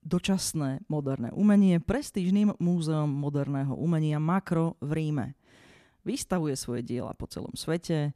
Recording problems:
none

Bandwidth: 14.5 kHz